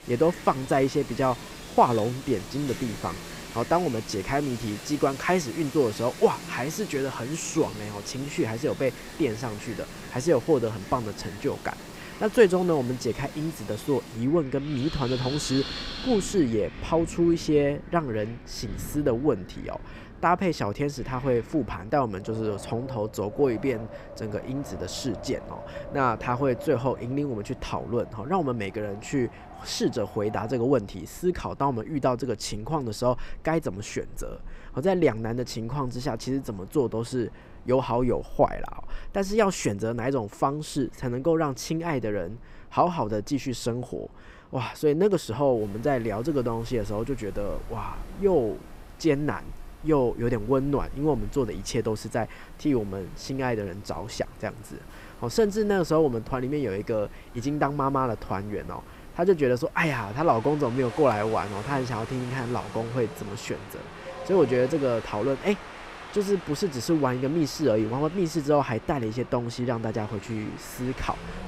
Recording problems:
wind in the background; noticeable; throughout; 15 dB below the speech

